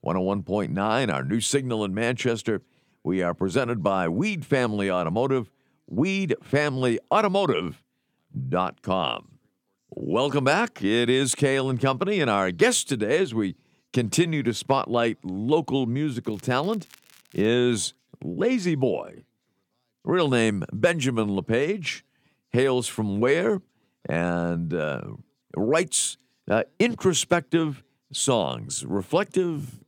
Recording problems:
crackling; faint; from 16 to 17 s; 30 dB below the speech

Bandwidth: 17.5 kHz